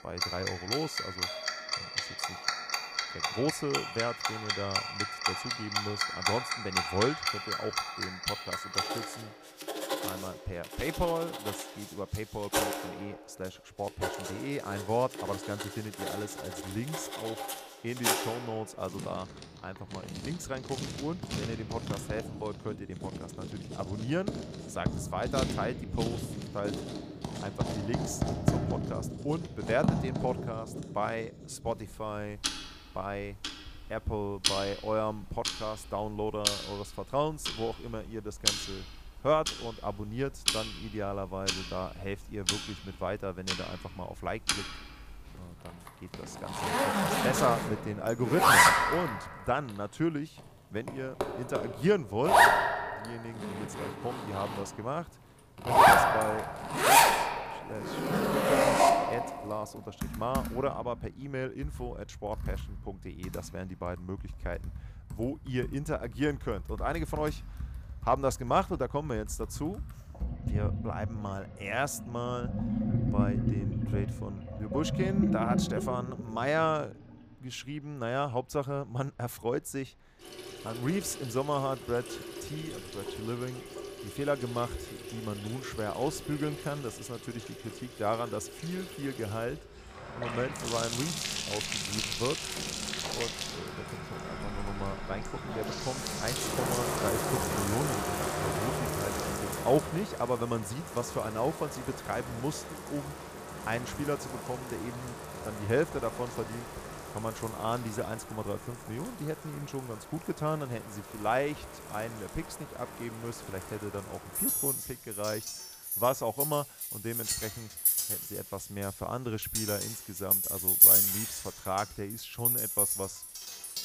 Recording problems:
household noises; very loud; throughout; 5 dB above the speech
doorbell; noticeable; from 1.5 to 3 s; peak 8 dB below the speech

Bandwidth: 15 kHz